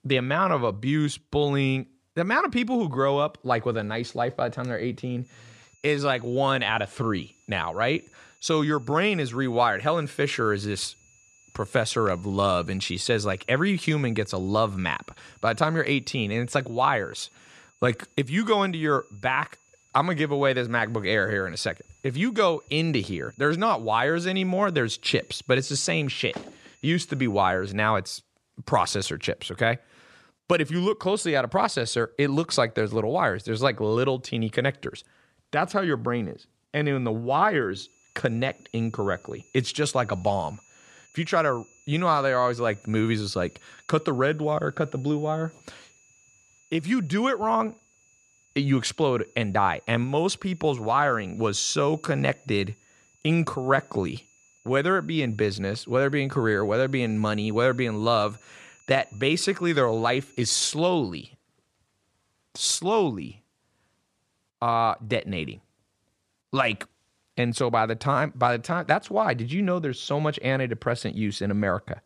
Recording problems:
high-pitched whine; faint; from 5.5 to 28 s and from 38 s to 1:01; 7 kHz, 30 dB below the speech

